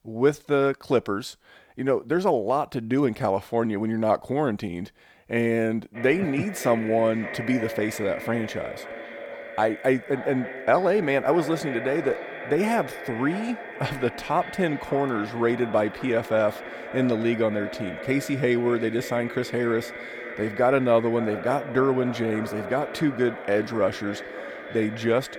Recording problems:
echo of what is said; strong; from 6 s on; 560 ms later, 10 dB below the speech

